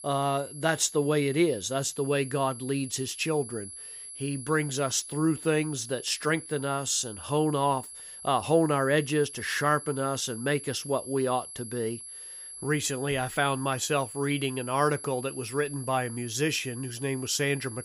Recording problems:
high-pitched whine; noticeable; throughout; 11 kHz, 10 dB below the speech

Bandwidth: 15.5 kHz